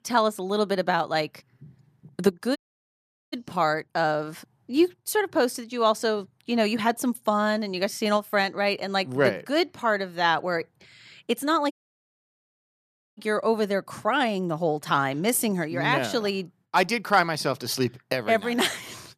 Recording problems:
audio cutting out; at 2.5 s for 1 s and at 12 s for 1.5 s

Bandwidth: 14.5 kHz